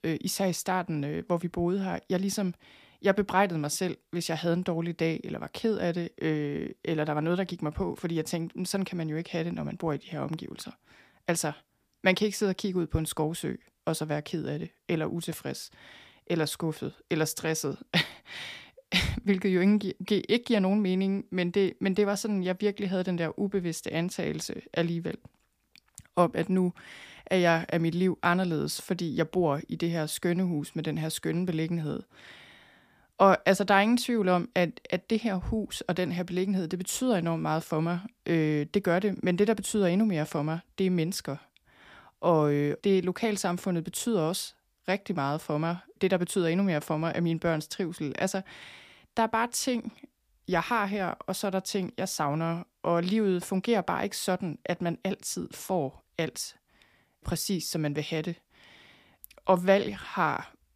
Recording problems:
none

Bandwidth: 15 kHz